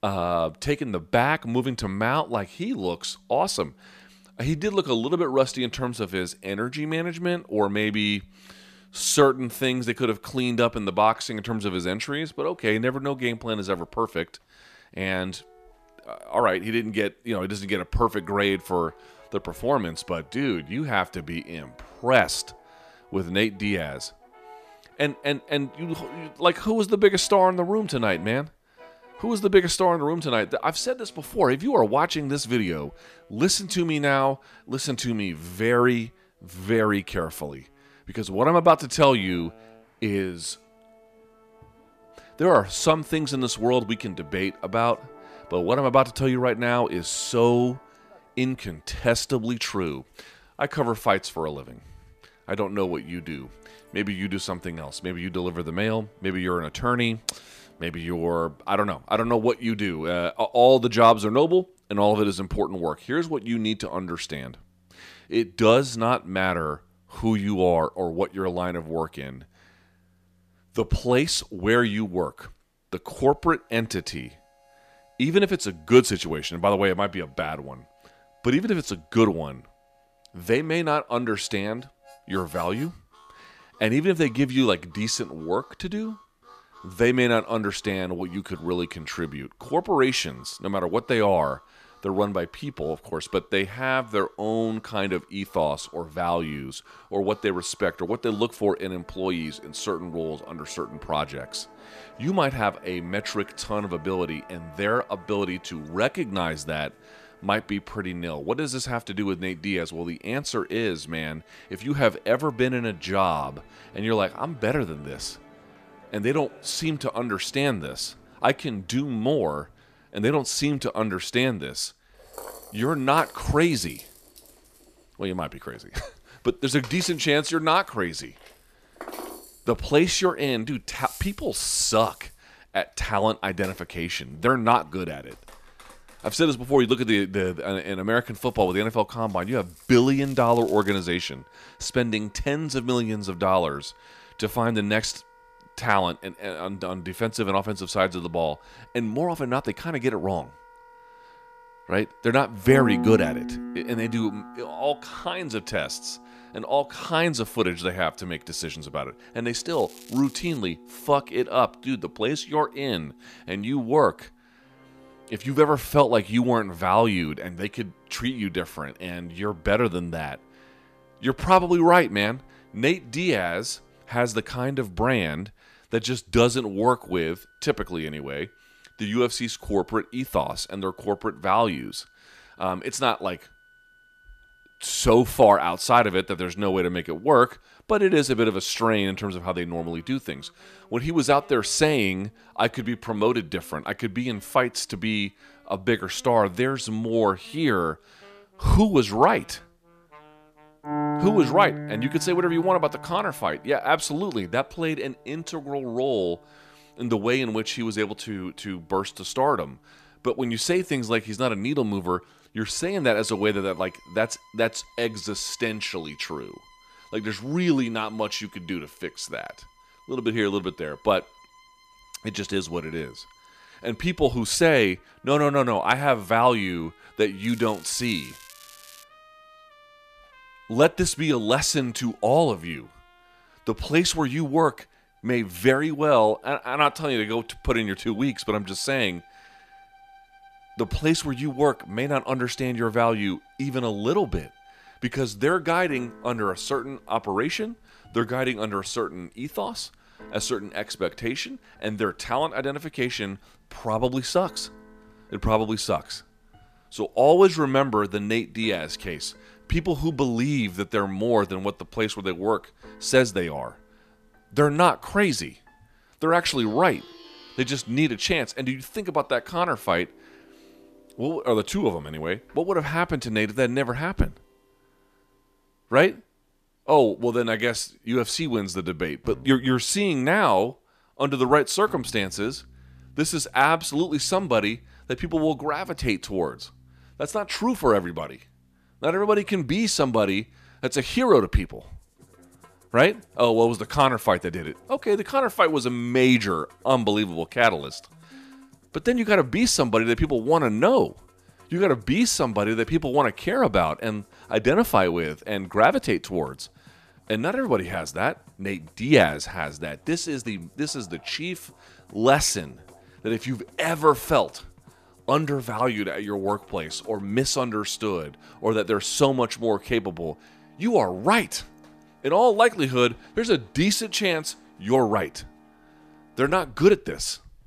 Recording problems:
background music; faint; throughout; 20 dB below the speech
crackling; faint; at 2:20, at 2:40 and from 3:47 to 3:49; 20 dB below the speech

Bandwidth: 14.5 kHz